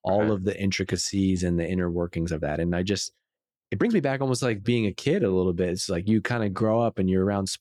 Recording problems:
uneven, jittery; strongly; from 1 to 6.5 s

